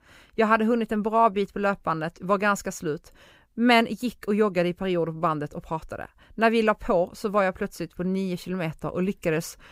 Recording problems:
none

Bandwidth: 15.5 kHz